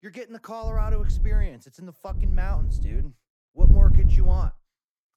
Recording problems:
wind noise on the microphone; faint; at 0.5 s, at 2 s and at 3.5 s; 4 dB below the speech

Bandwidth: 18.5 kHz